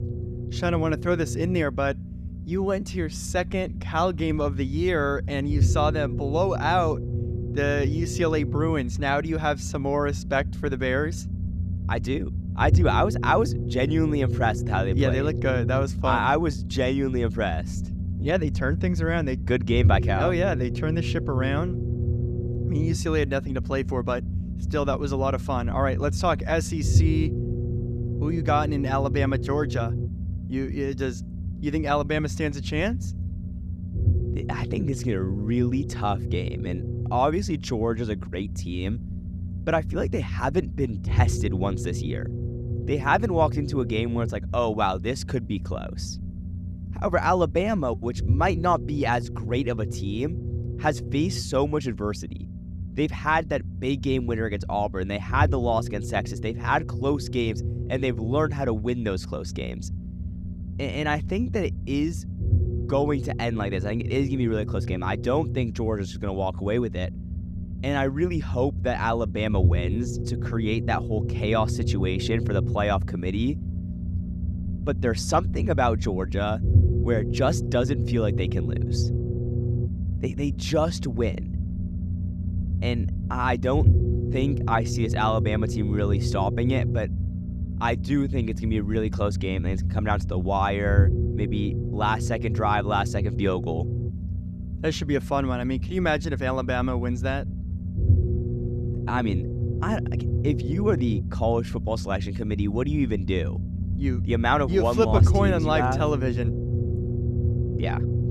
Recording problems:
low rumble; noticeable; throughout; 15 dB below the speech

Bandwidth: 14.5 kHz